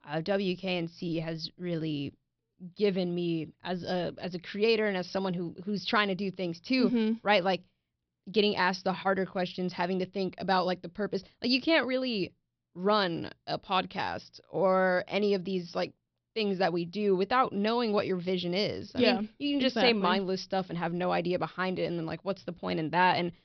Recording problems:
high frequencies cut off; noticeable; nothing above 5.5 kHz

